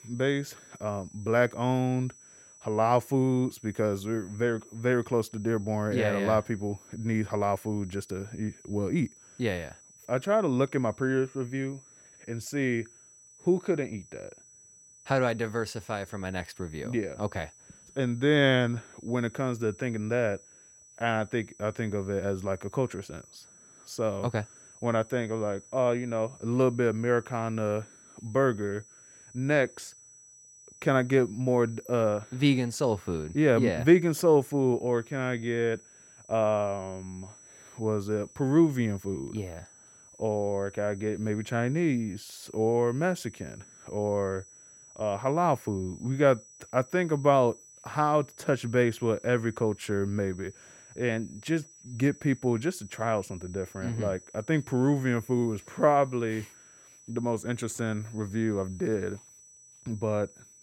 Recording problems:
high-pitched whine; faint; throughout; 6 kHz, 25 dB below the speech

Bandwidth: 16 kHz